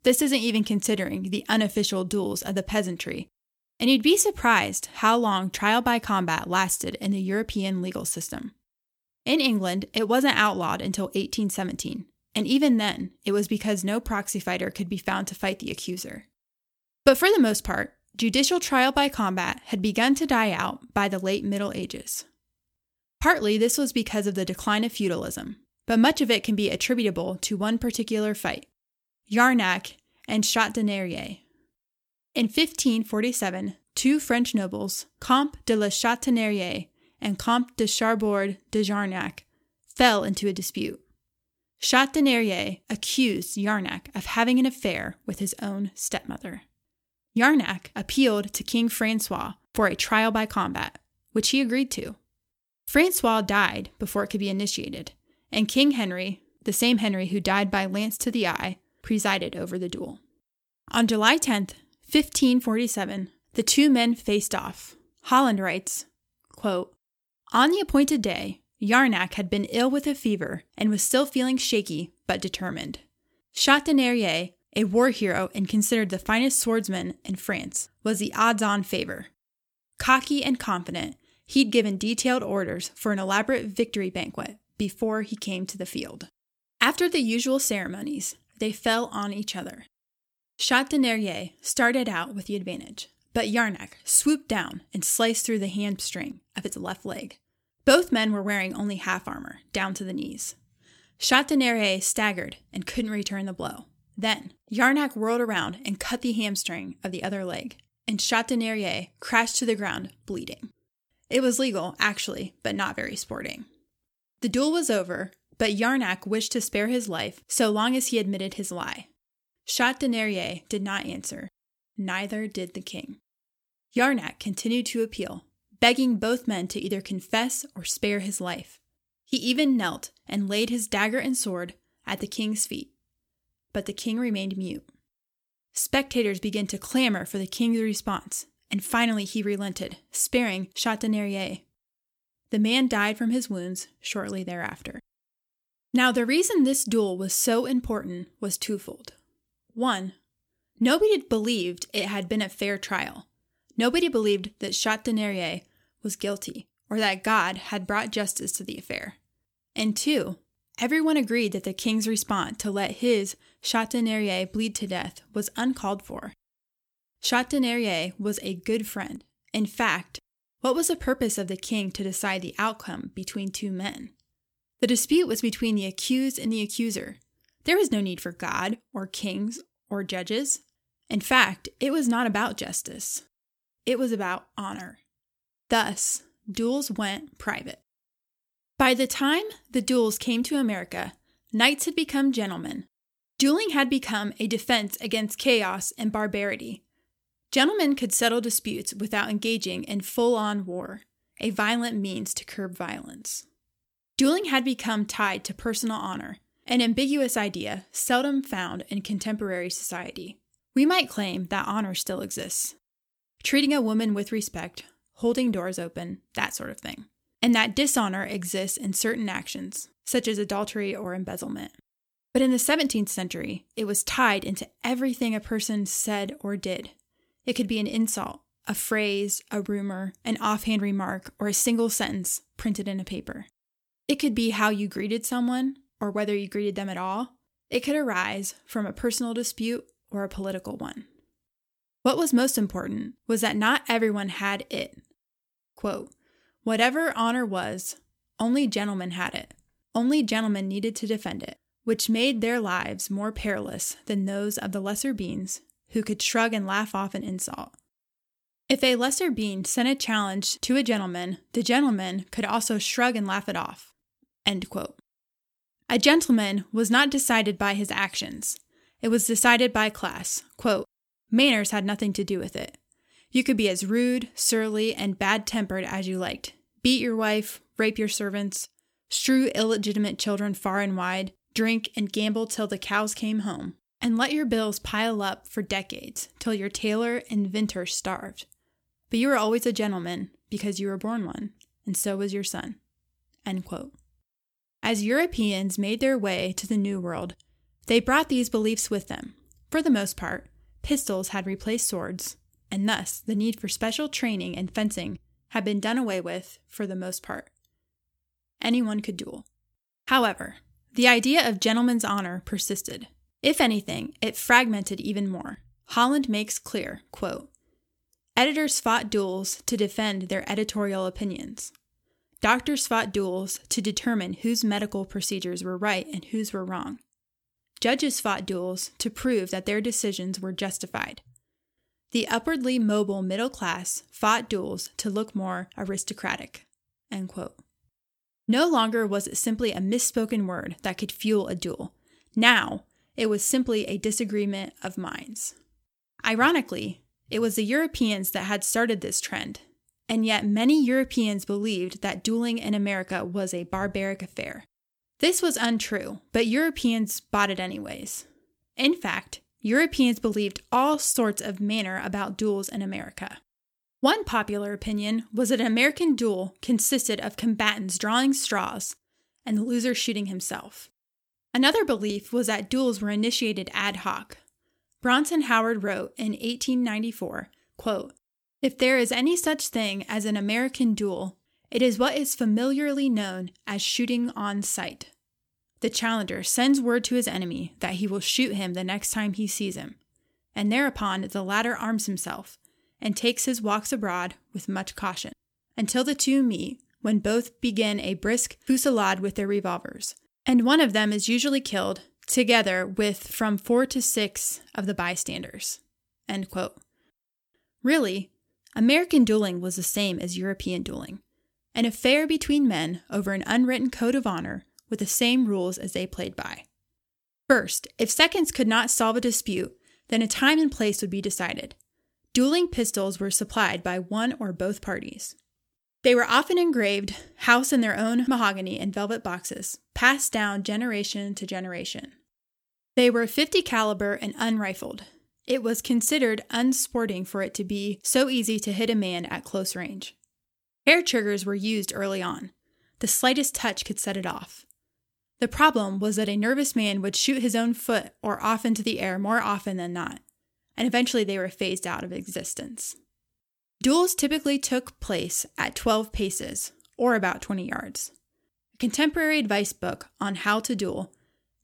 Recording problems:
none

